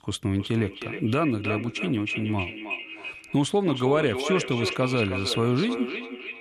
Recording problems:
echo of what is said; strong; throughout; 320 ms later, 6 dB below the speech

